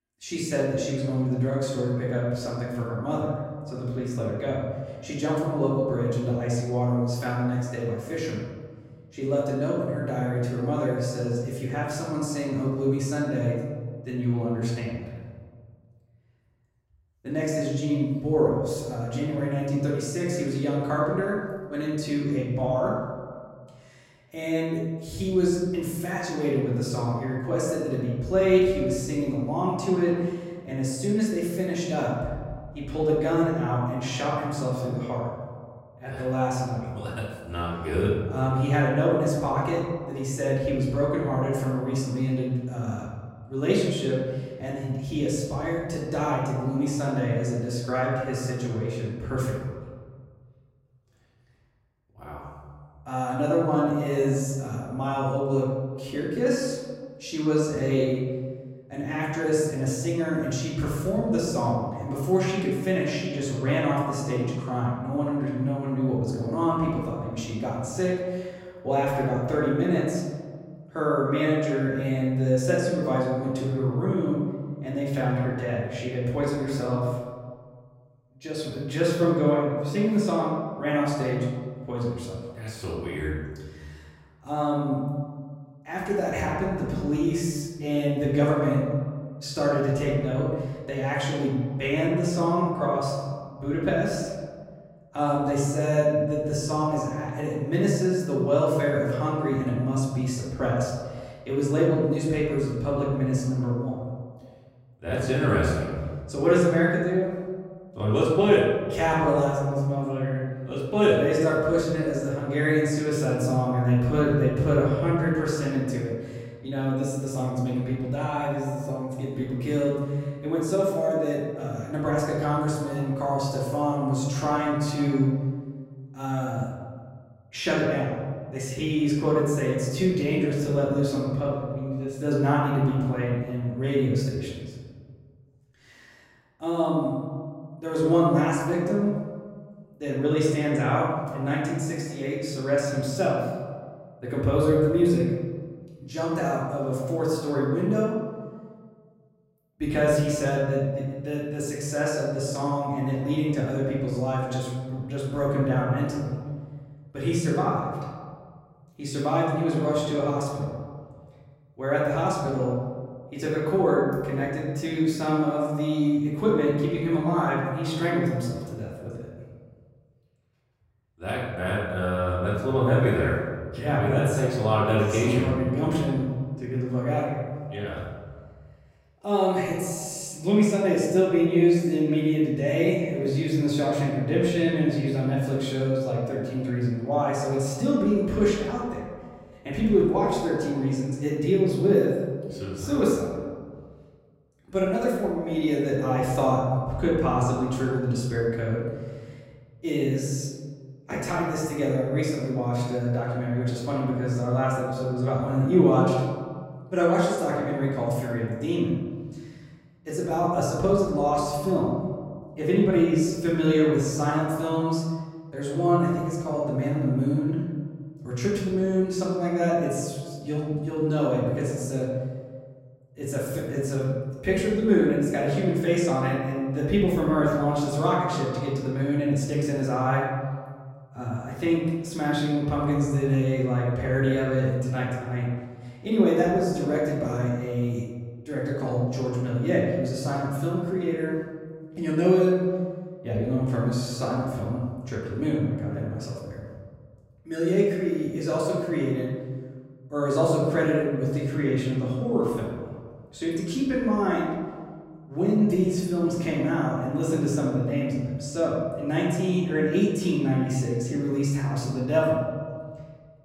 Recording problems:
off-mic speech; far
room echo; noticeable; dies away in 1.6 s

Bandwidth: 16 kHz